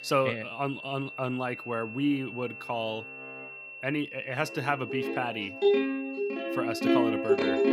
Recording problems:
background music; very loud; throughout; 4 dB above the speech
high-pitched whine; loud; throughout; 2.5 kHz, 9 dB below the speech

